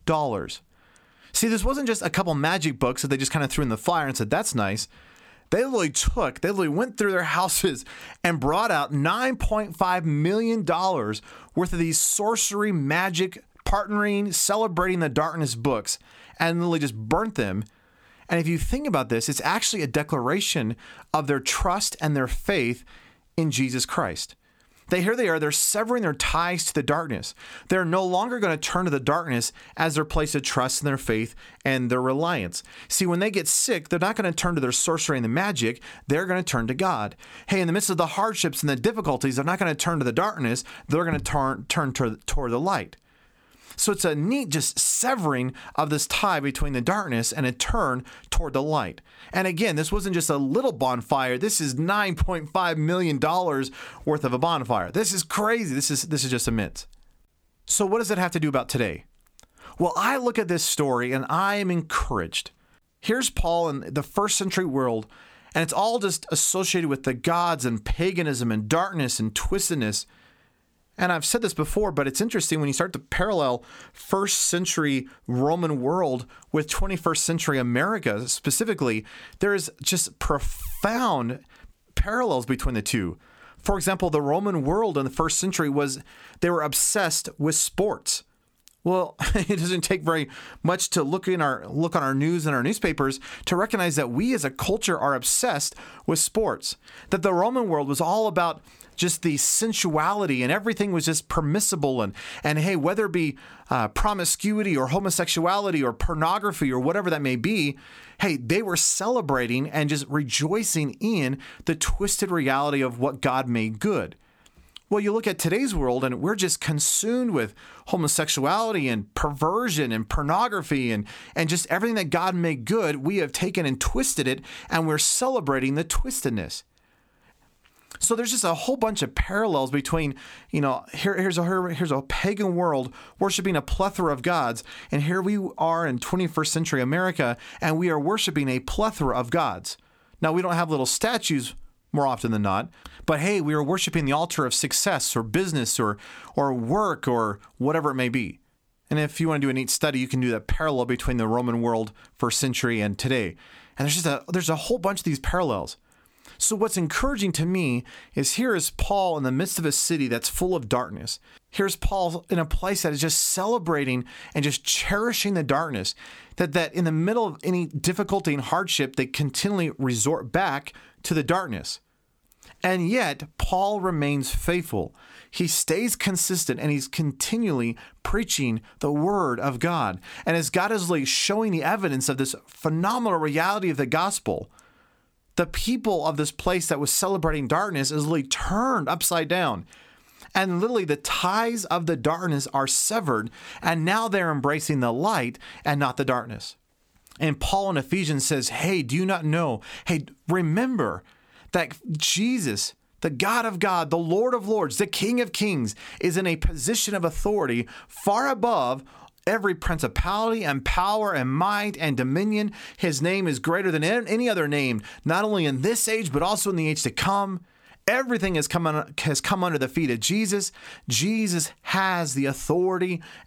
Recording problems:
squashed, flat; somewhat

